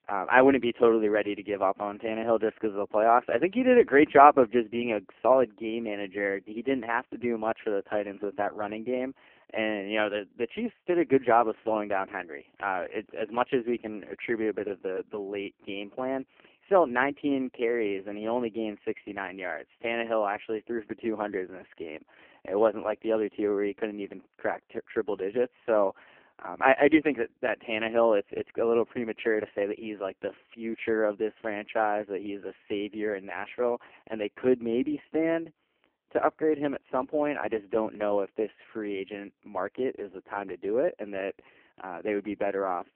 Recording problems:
phone-call audio; poor line; nothing above 3 kHz

